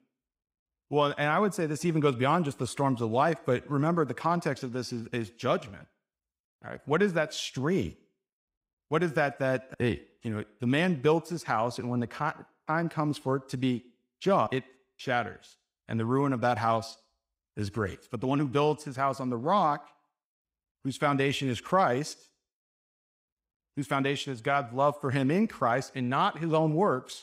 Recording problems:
none

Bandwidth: 15.5 kHz